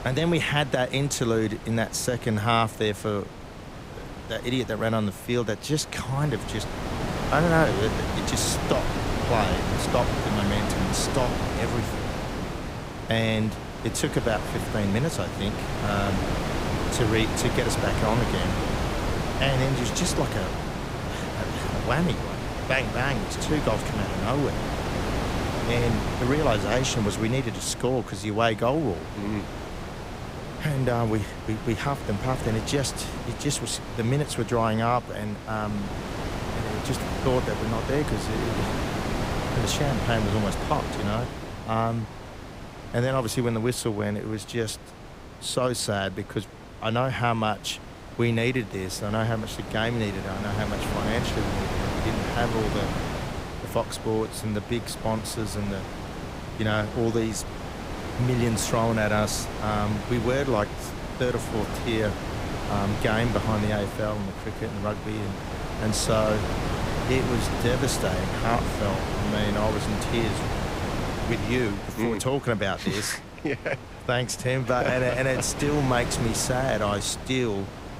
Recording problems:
wind noise on the microphone; heavy; 4 dB below the speech

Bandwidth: 15.5 kHz